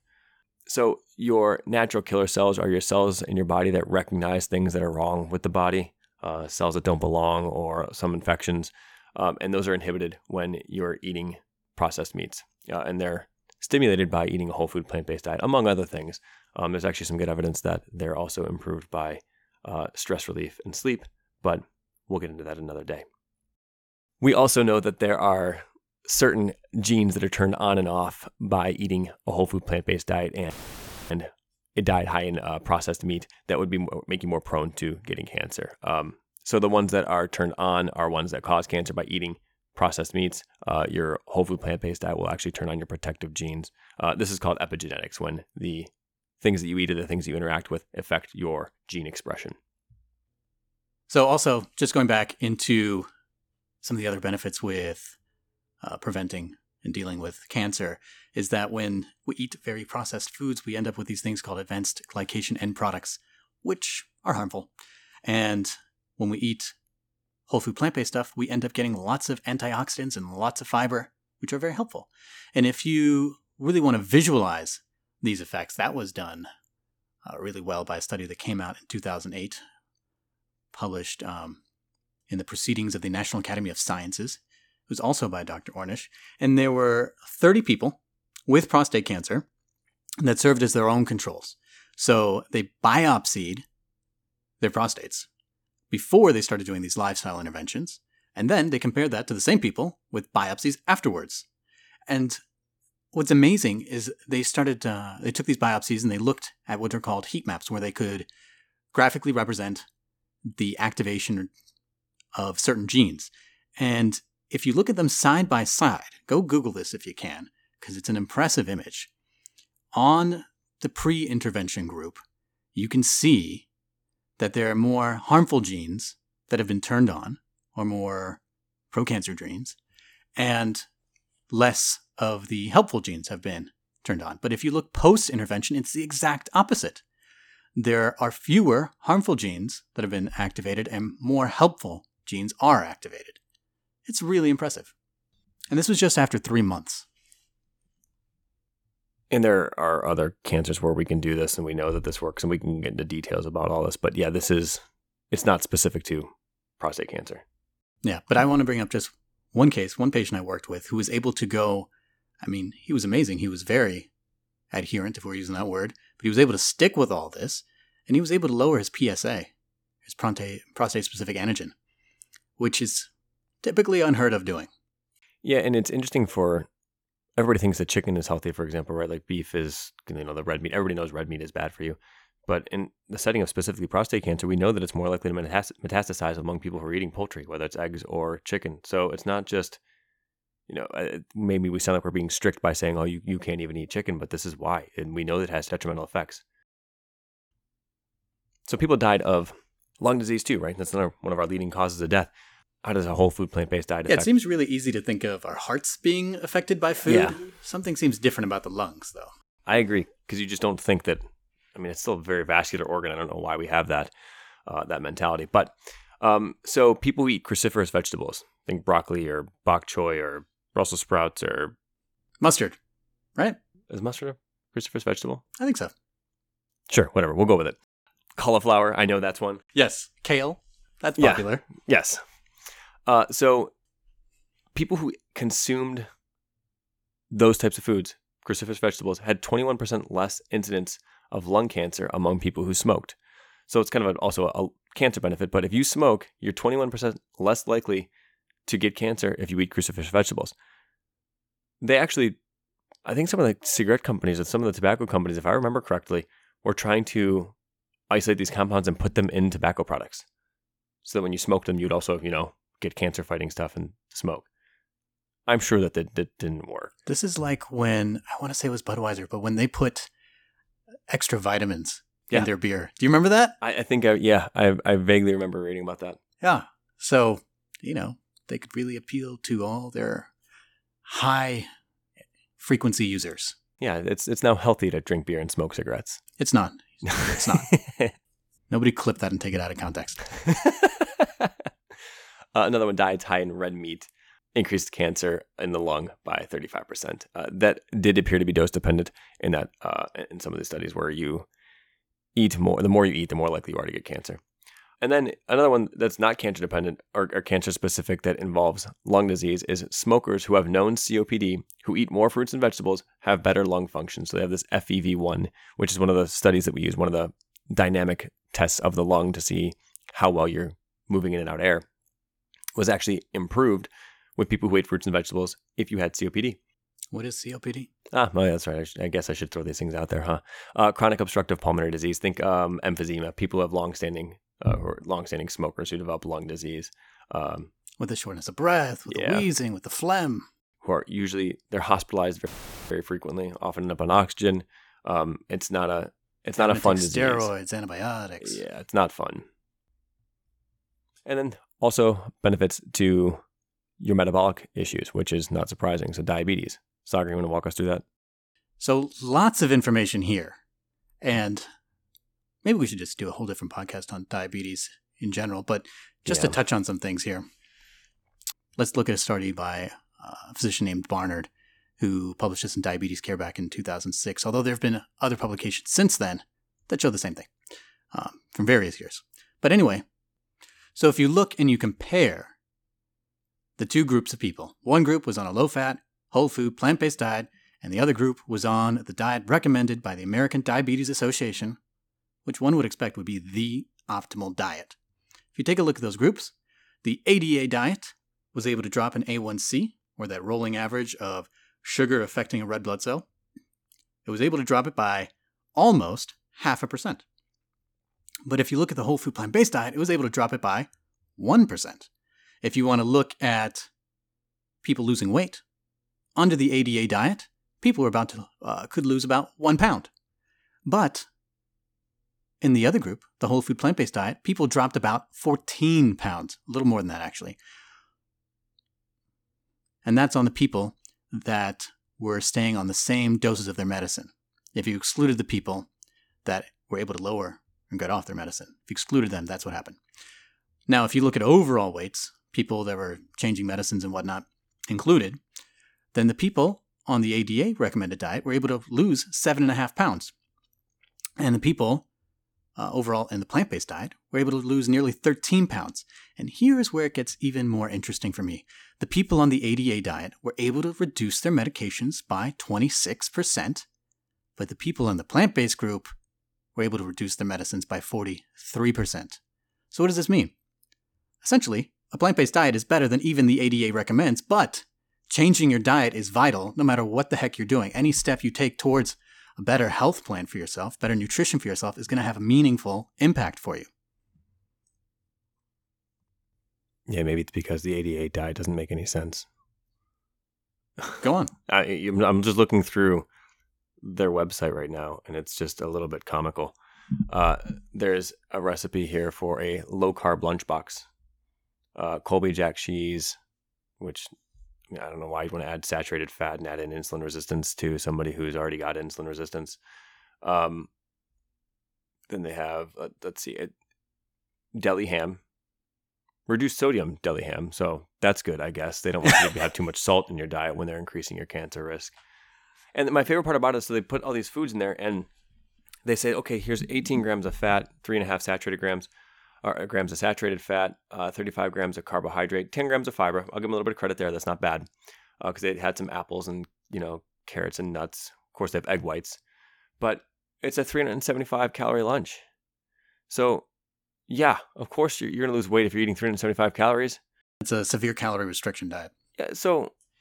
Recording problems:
audio cutting out; filled with static; at 31 s for 0.5 s and at 5:42

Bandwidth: 18.5 kHz